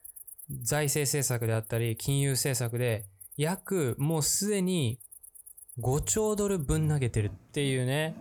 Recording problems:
animal sounds; noticeable; throughout; 15 dB below the speech

